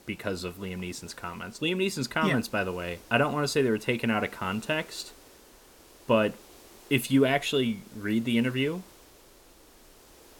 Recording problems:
hiss; faint; throughout; 25 dB below the speech

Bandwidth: 17 kHz